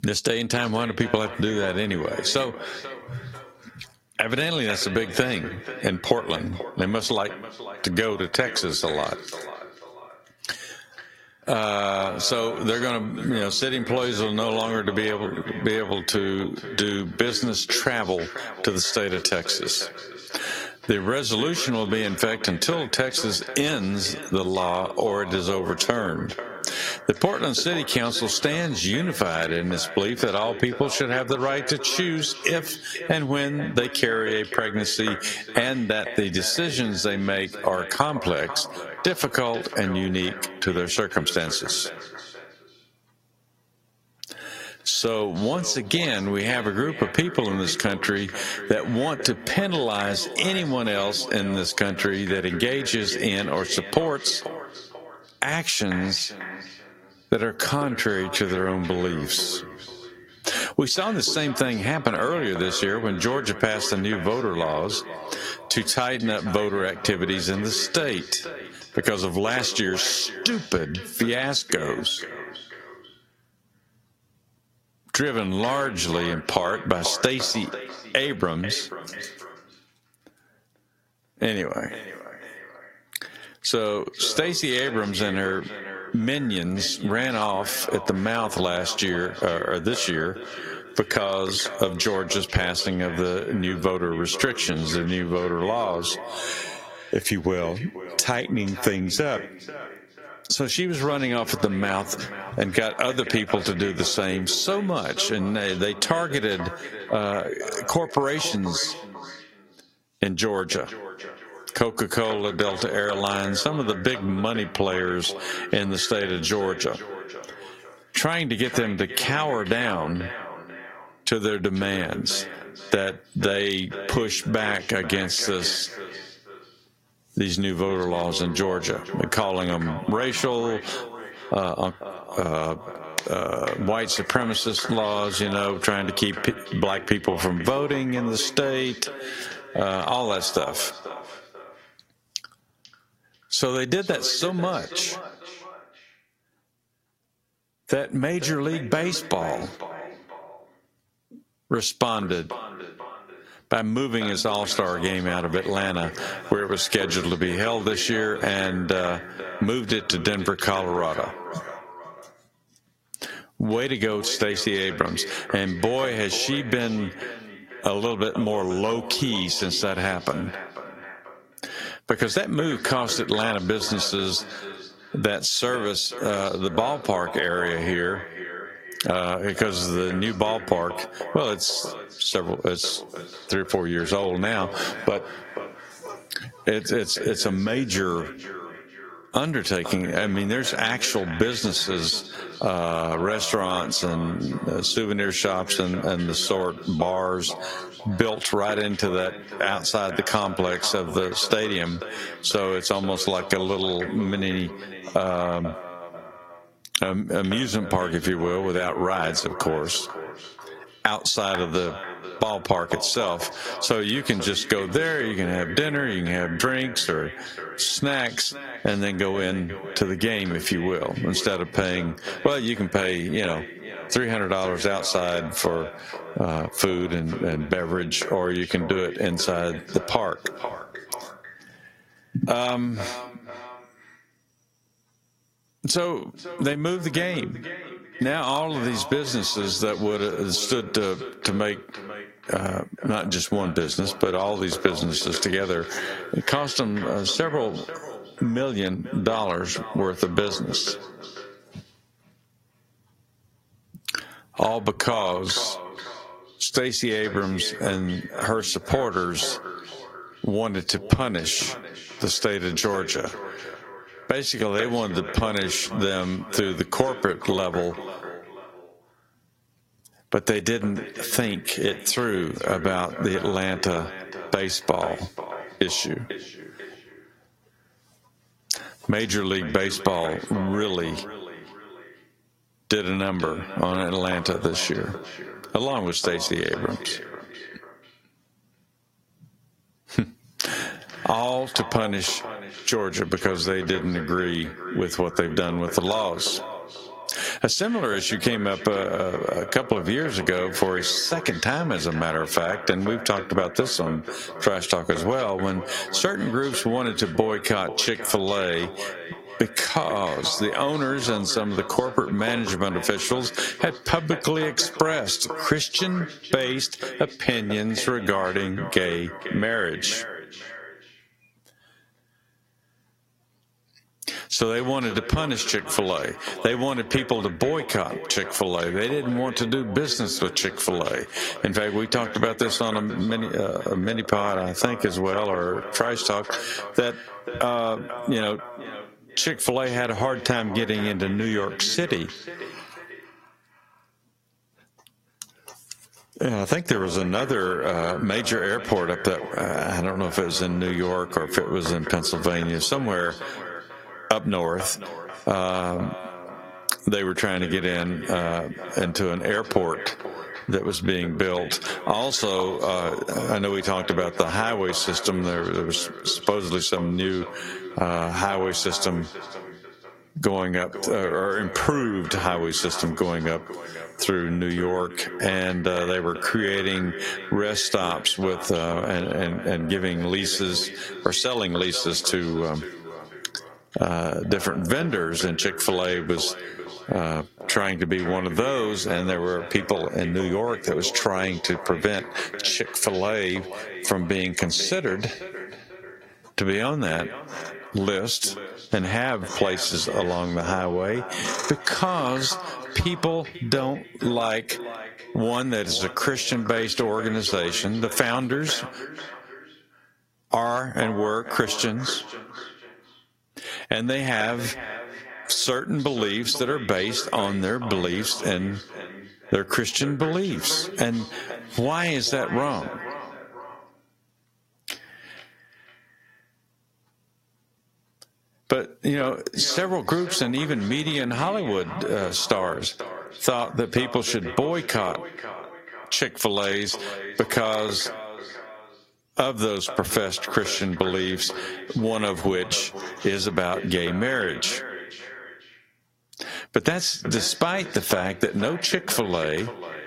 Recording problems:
squashed, flat; heavily
echo of what is said; noticeable; throughout; 490 ms later, 15 dB below the speech
garbled, watery; slightly; nothing above 16 kHz

